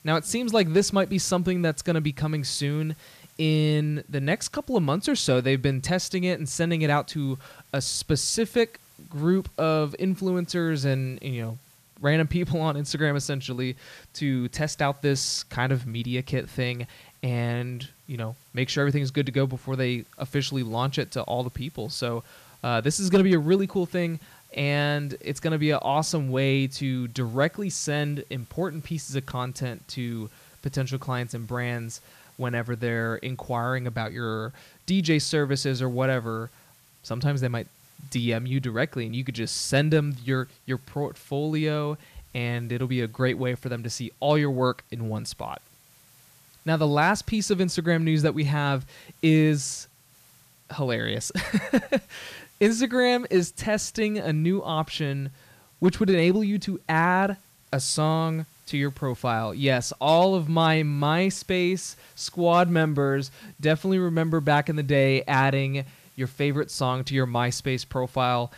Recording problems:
hiss; faint; throughout; 30 dB below the speech

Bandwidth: 14.5 kHz